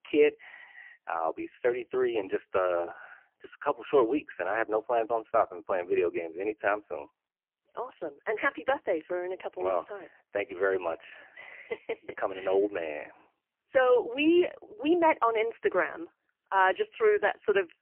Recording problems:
phone-call audio; poor line; nothing above 3 kHz

